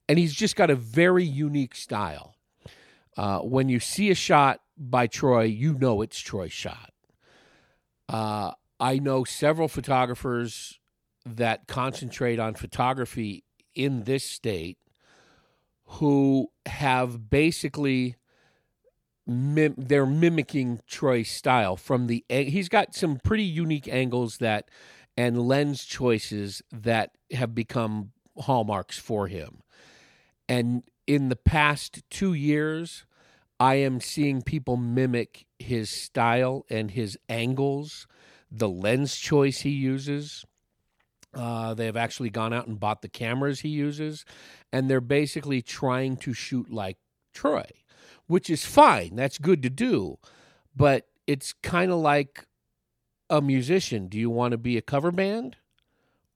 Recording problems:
none

